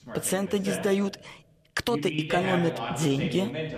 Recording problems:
voice in the background; loud; throughout; 6 dB below the speech

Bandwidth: 14.5 kHz